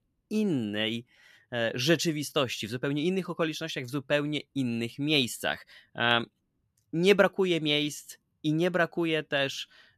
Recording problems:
none

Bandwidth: 14 kHz